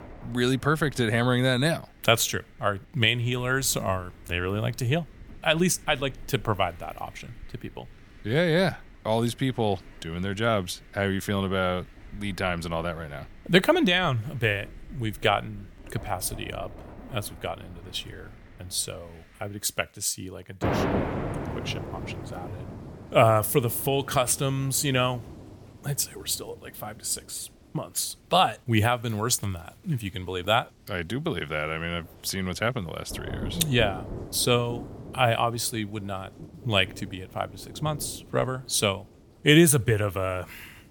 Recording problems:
rain or running water; noticeable; throughout; 15 dB below the speech

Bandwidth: 18.5 kHz